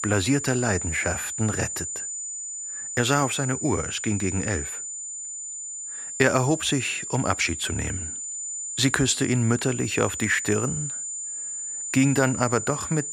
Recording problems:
high-pitched whine; loud; throughout; 7 kHz, 6 dB below the speech

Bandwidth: 15 kHz